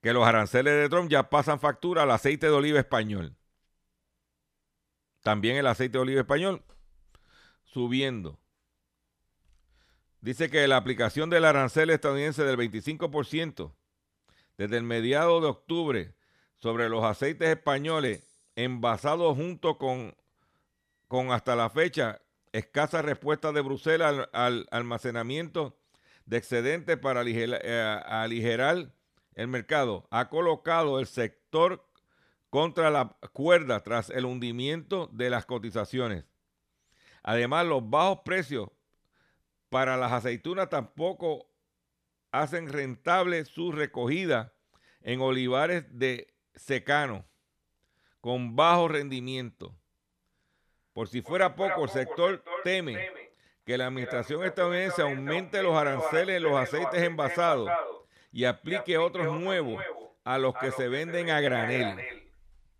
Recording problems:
echo of what is said; strong; from 50 s on; 280 ms later, 8 dB below the speech

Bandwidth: 14.5 kHz